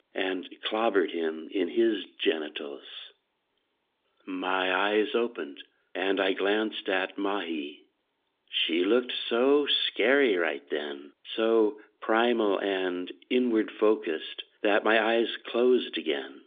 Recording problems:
phone-call audio; nothing above 3.5 kHz

